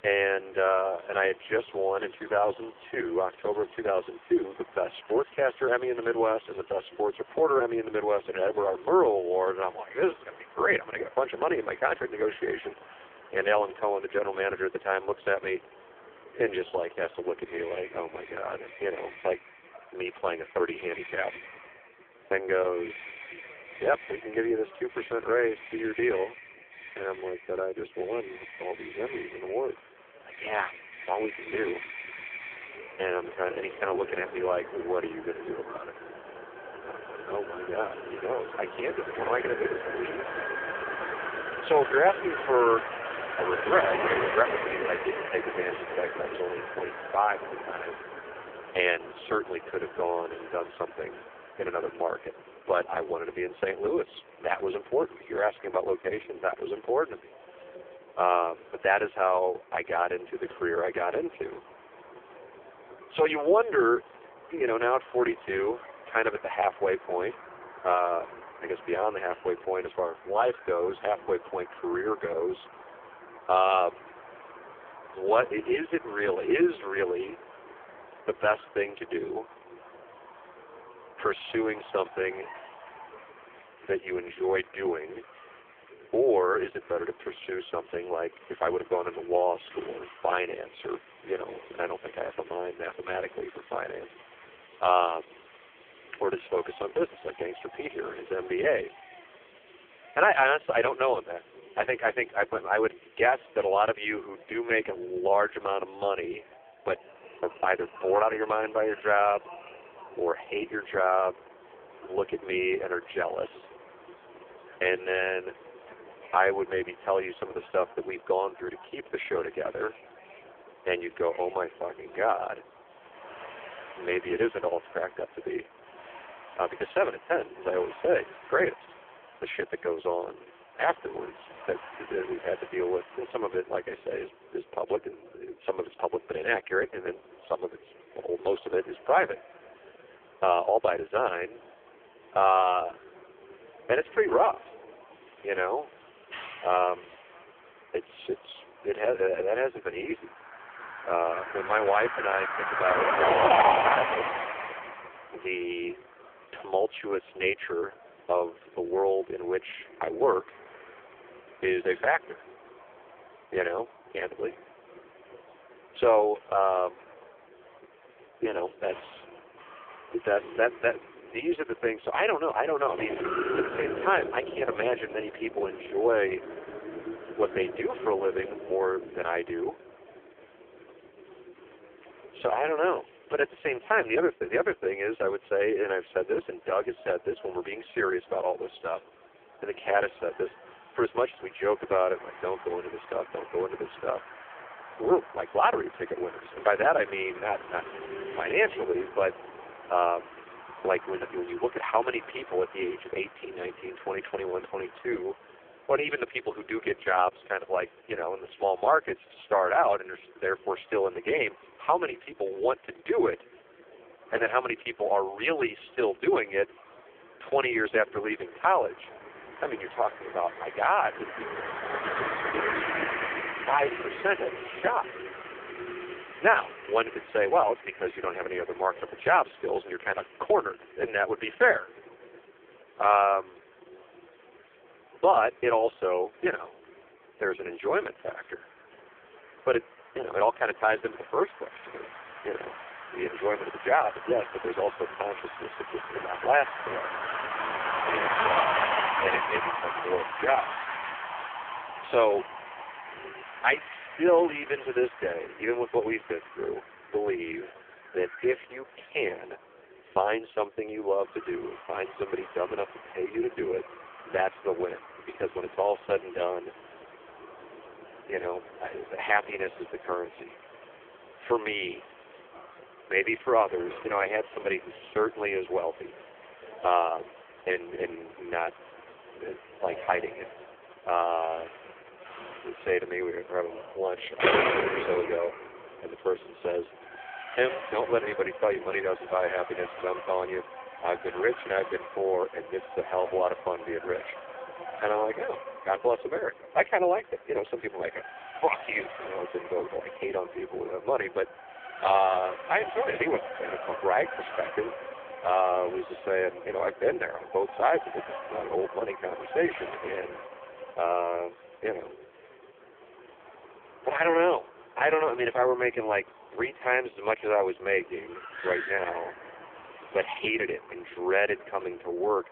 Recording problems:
phone-call audio; poor line
traffic noise; loud; throughout; 7 dB below the speech
murmuring crowd; faint; throughout; 25 dB below the speech

